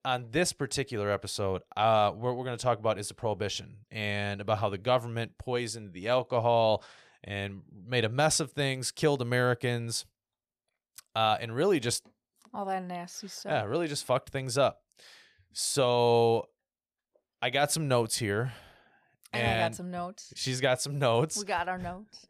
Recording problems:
none

